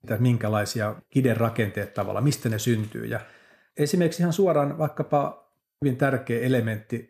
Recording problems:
none

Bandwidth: 14 kHz